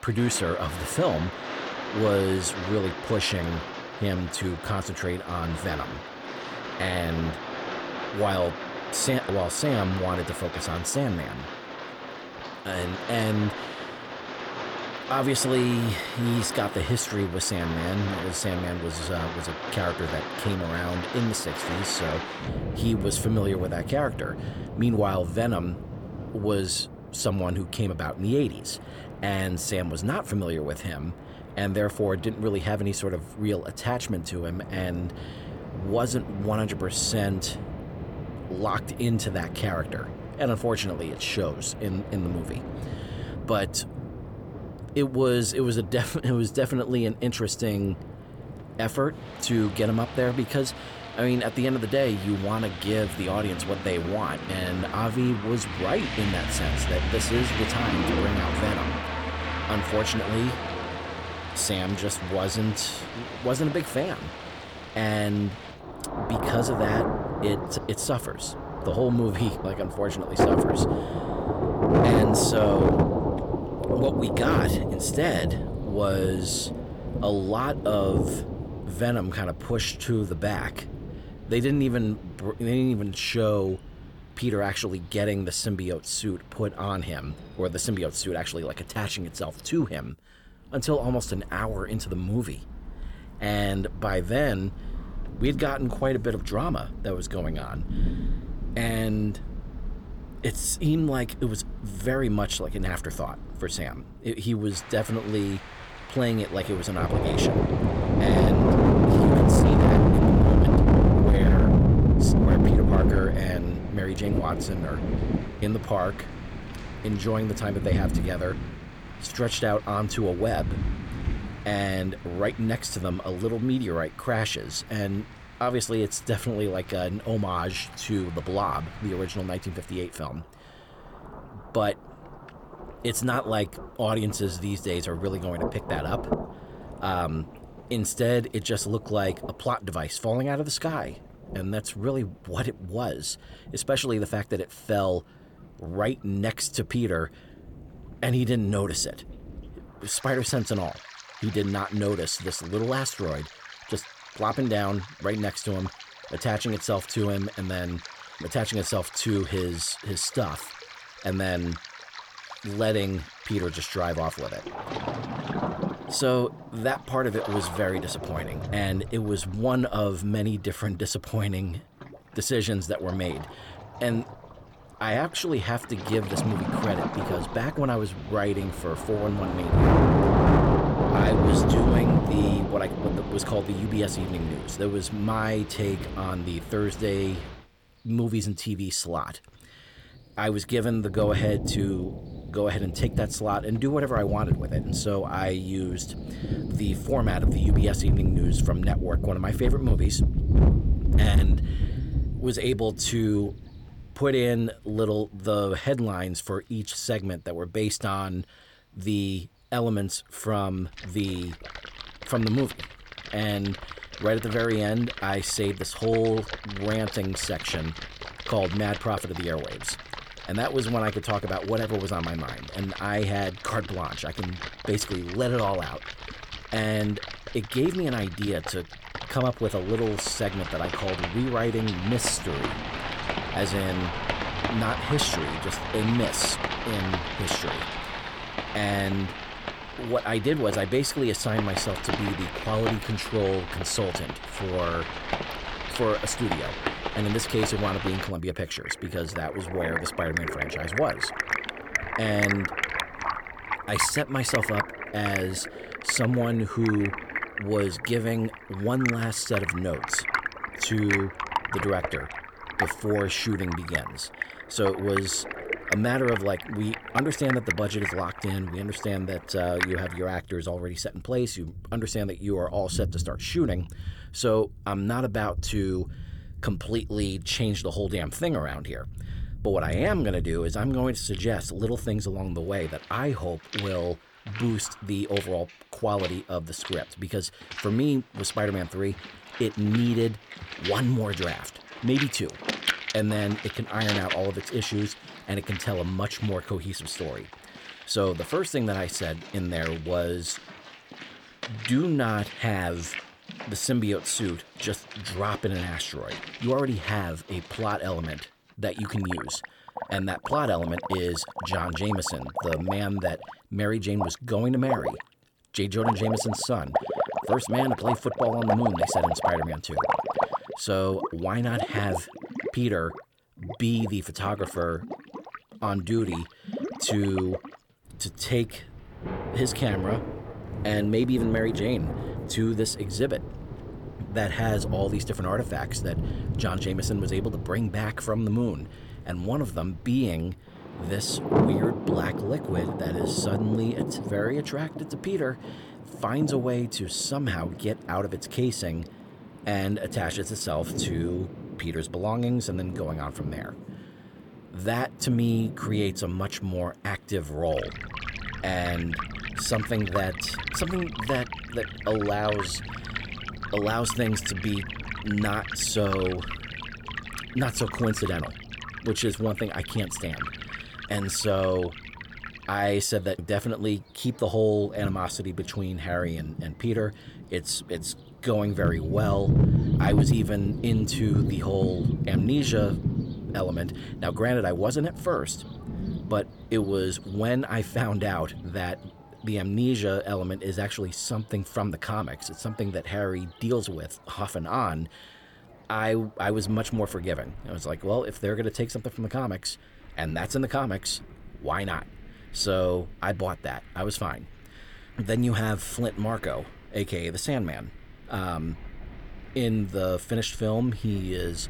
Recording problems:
distortion; slight; 0.7% of the sound clipped
rain or running water; loud; throughout; 2 dB below the speech

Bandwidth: 18.5 kHz